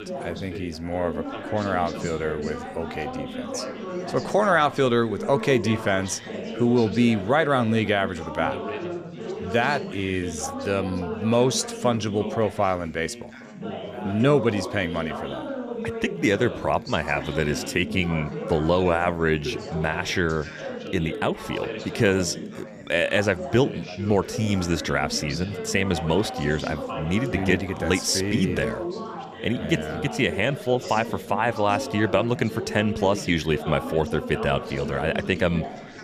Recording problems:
background chatter; loud; throughout; 4 voices, 9 dB below the speech

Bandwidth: 15 kHz